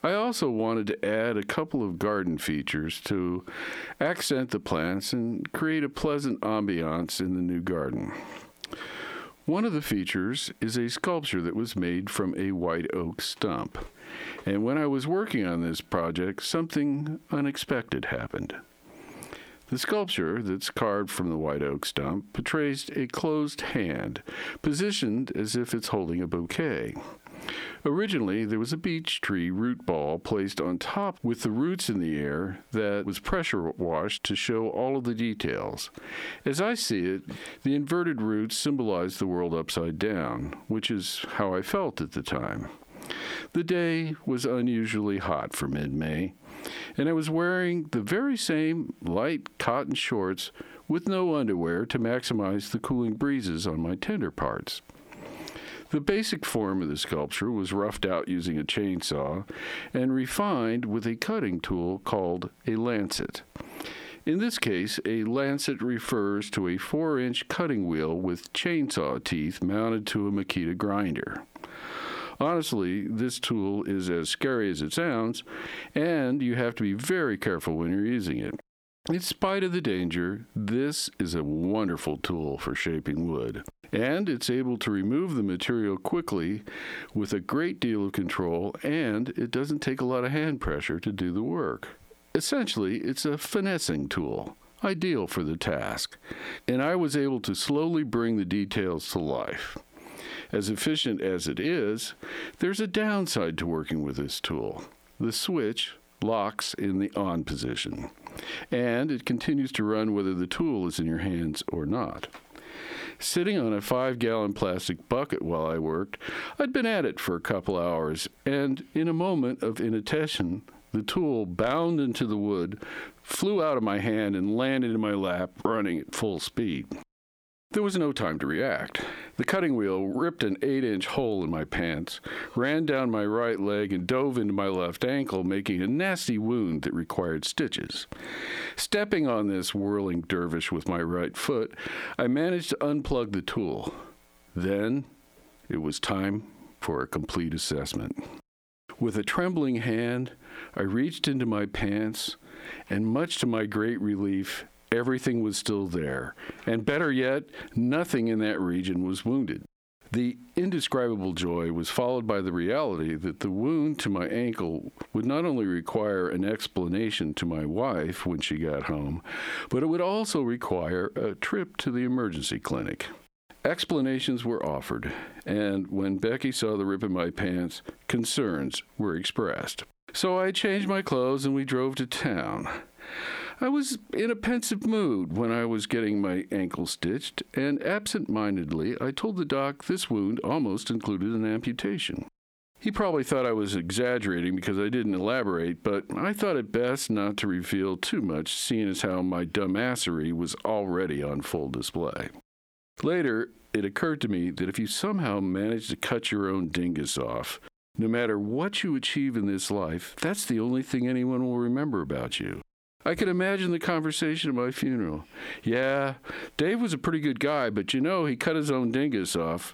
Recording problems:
squashed, flat; heavily

